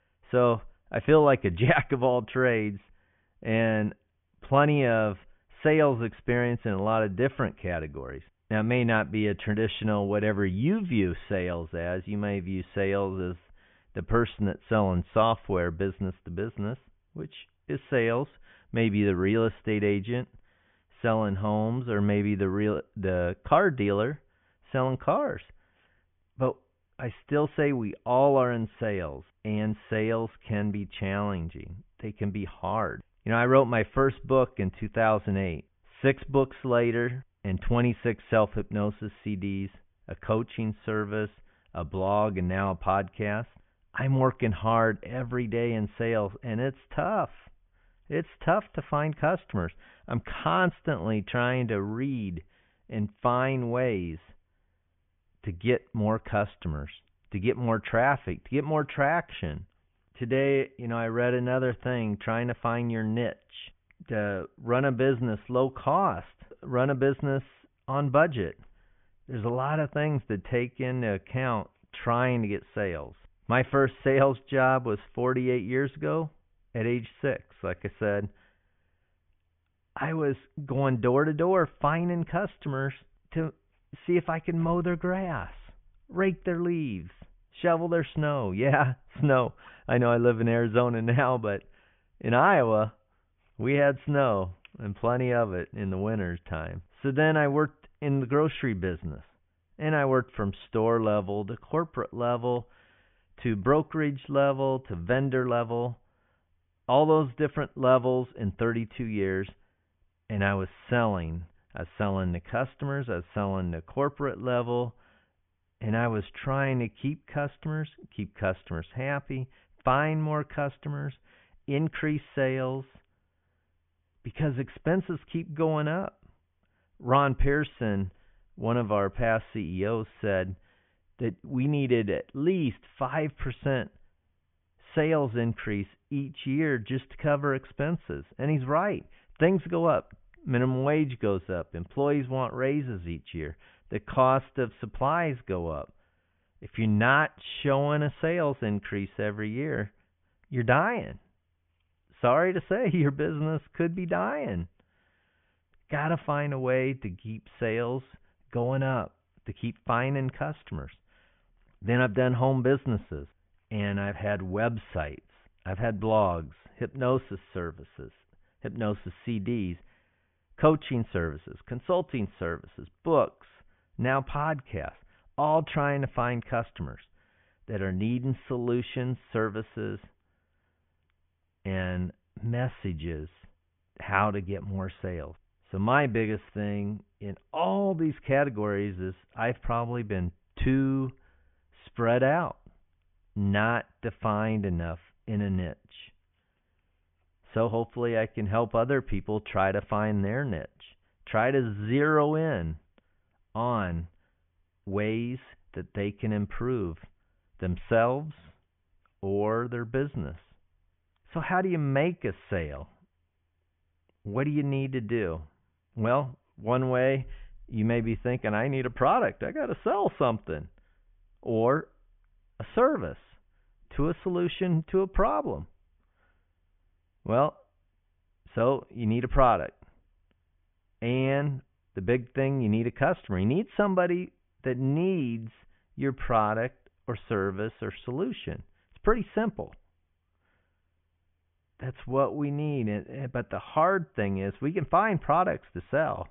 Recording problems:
high frequencies cut off; severe; nothing above 3.5 kHz

